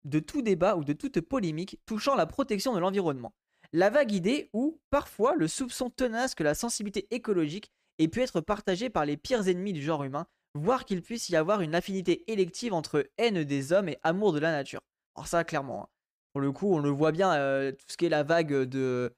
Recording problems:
none

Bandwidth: 15 kHz